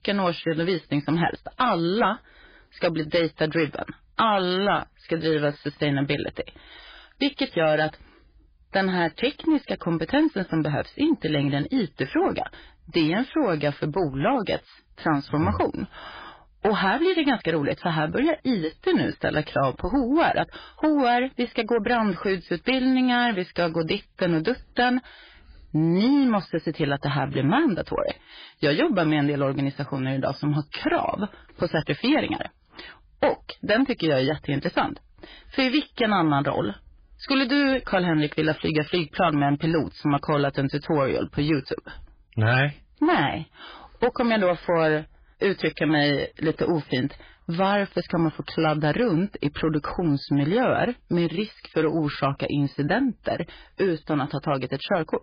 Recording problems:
garbled, watery; badly
distortion; slight; 10 dB below the speech

